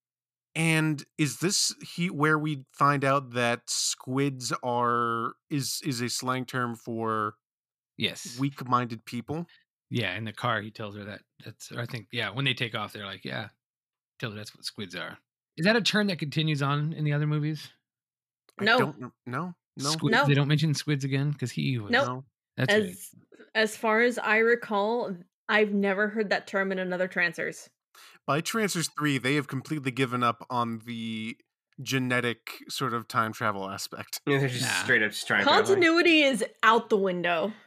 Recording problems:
none

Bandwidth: 14.5 kHz